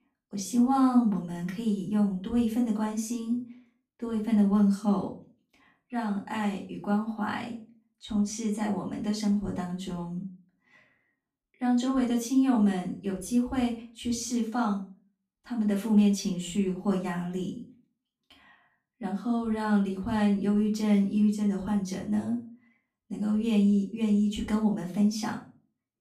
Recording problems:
off-mic speech; far
room echo; slight; dies away in 0.3 s

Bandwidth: 14.5 kHz